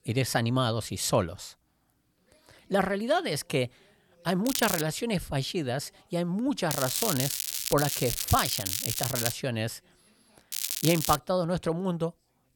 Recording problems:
crackling; loud; at 4.5 s, from 6.5 to 9.5 s and at 11 s; 1 dB below the speech

